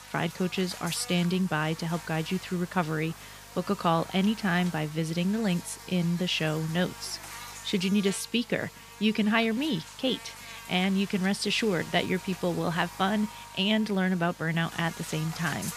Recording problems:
electrical hum; noticeable; throughout; 50 Hz, 15 dB below the speech

